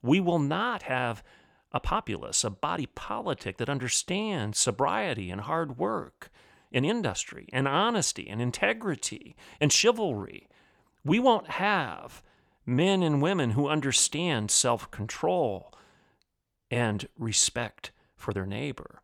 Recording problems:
uneven, jittery; strongly; from 0.5 to 18 s

